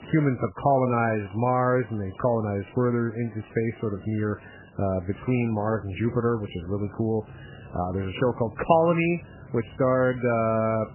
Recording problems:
garbled, watery; badly; nothing above 3 kHz
machinery noise; faint; throughout; 20 dB below the speech

